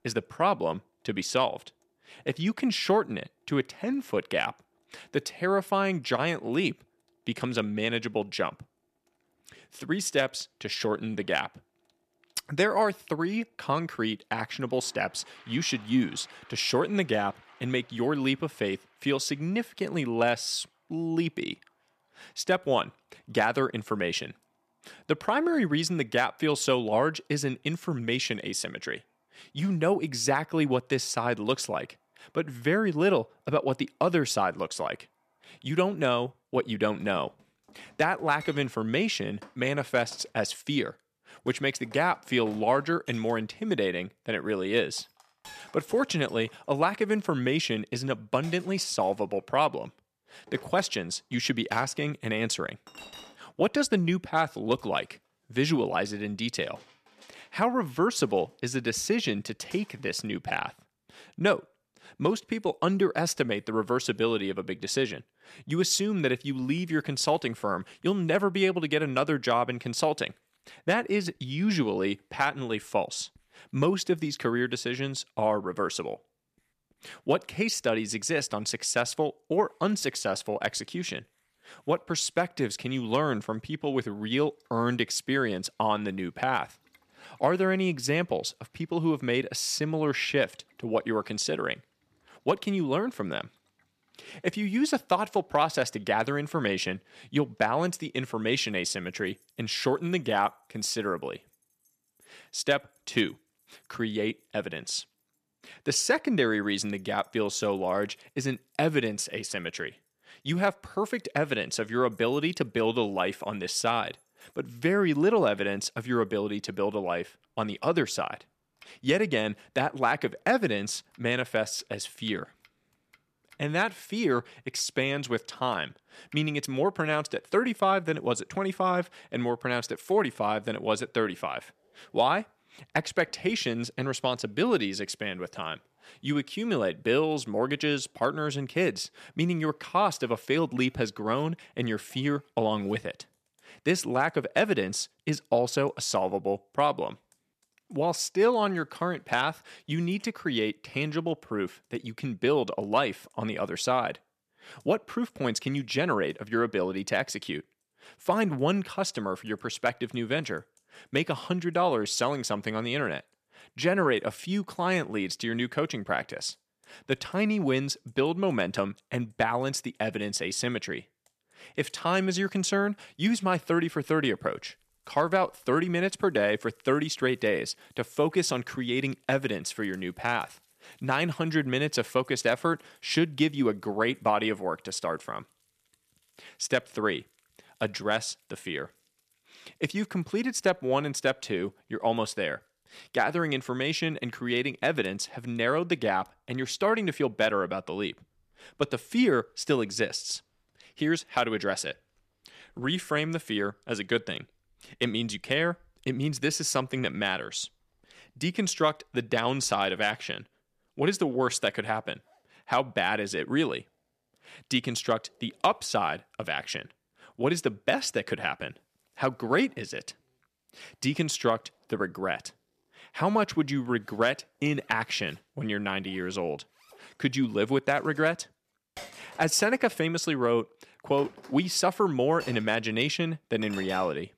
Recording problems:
household noises; faint; throughout; 30 dB below the speech

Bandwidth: 14.5 kHz